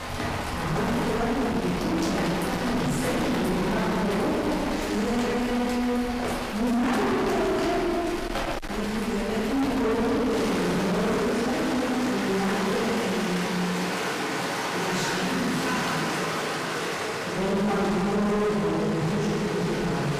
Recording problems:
distortion; heavy; 29% of the sound clipped
room echo; strong; dies away in 2.6 s
off-mic speech; far
rain or running water; loud; throughout; 4 dB below the speech
voice in the background; faint; throughout; 25 dB below the speech

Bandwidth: 15 kHz